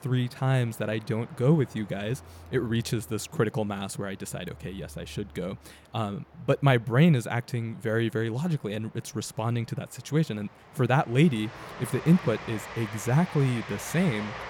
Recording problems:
train or aircraft noise; noticeable; throughout; 15 dB below the speech

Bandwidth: 17 kHz